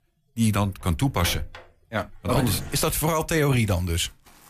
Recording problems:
household noises; noticeable; throughout; 15 dB below the speech

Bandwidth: 14.5 kHz